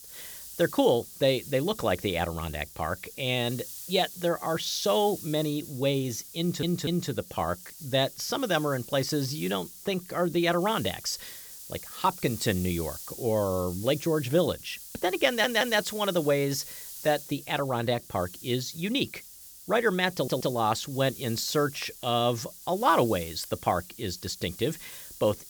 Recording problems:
hiss; noticeable; throughout; 15 dB below the speech
audio stuttering; at 6.5 s, at 15 s and at 20 s

